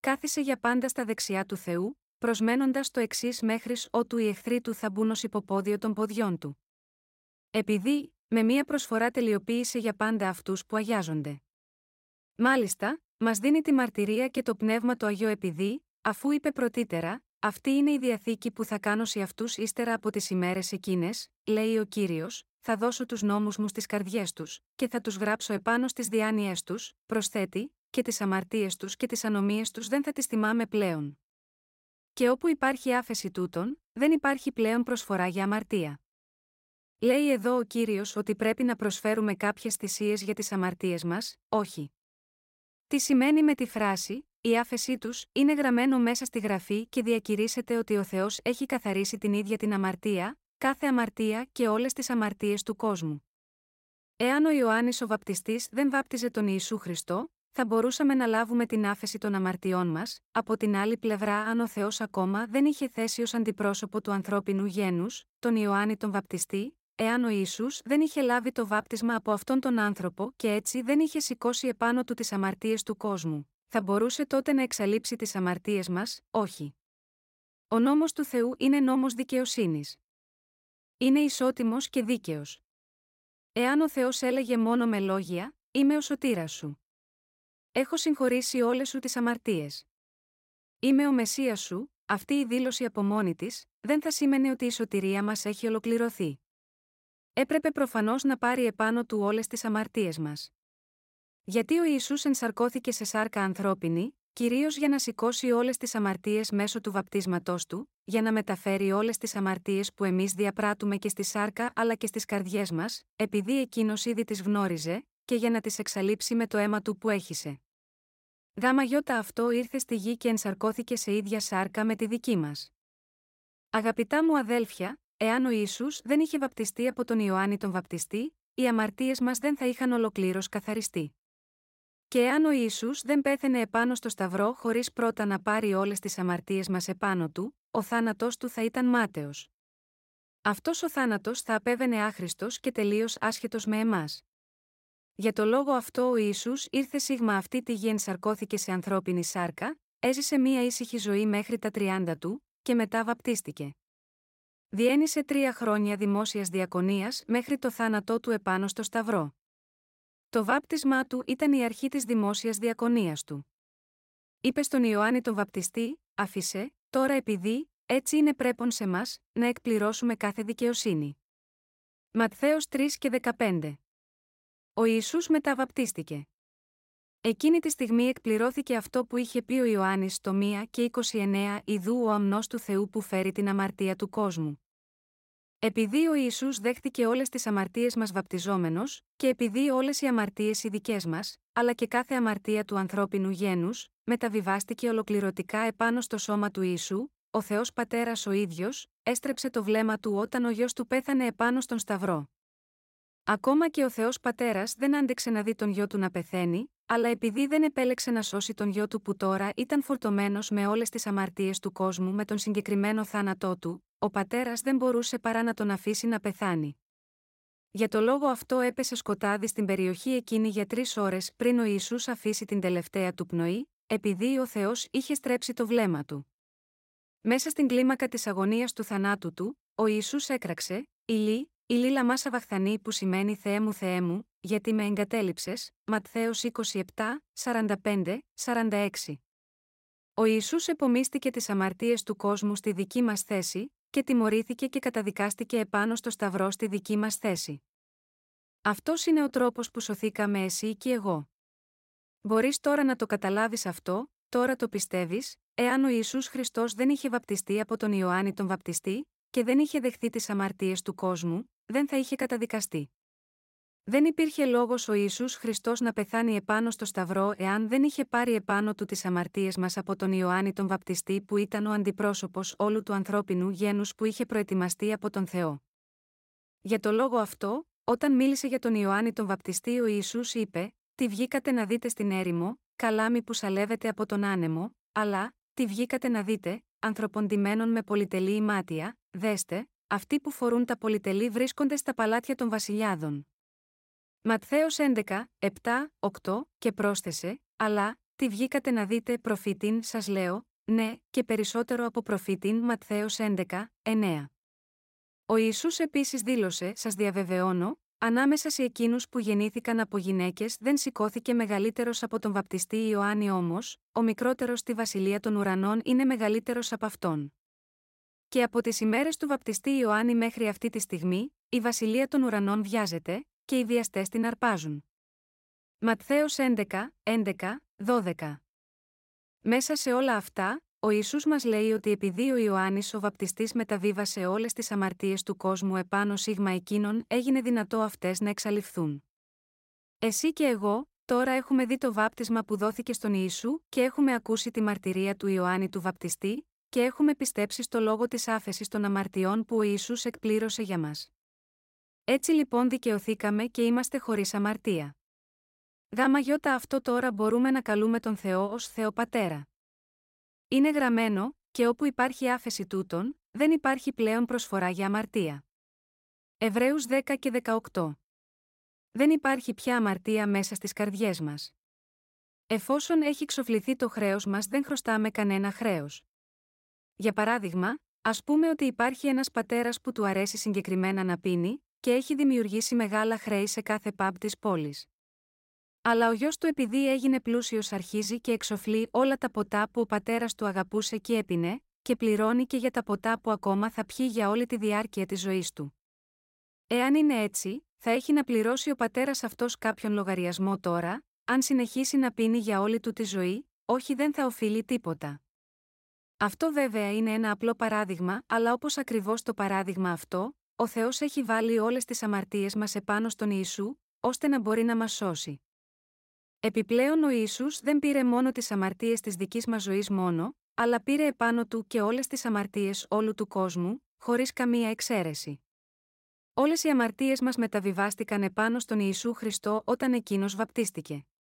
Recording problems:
none

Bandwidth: 16 kHz